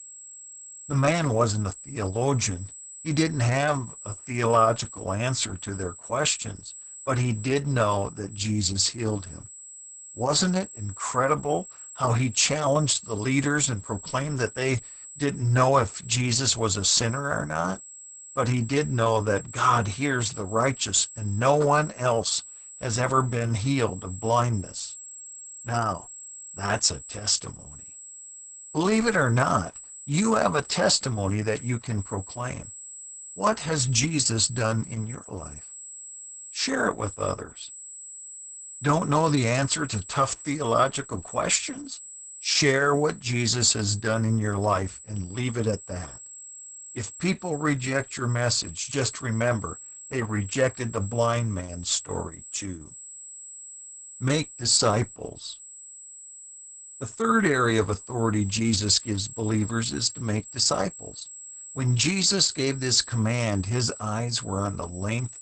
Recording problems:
garbled, watery; badly; nothing above 8 kHz
high-pitched whine; noticeable; throughout; 7.5 kHz, 15 dB below the speech

